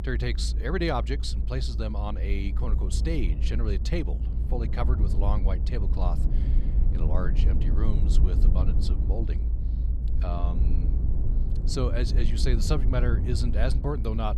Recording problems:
low rumble; loud; throughout; 9 dB below the speech

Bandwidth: 15 kHz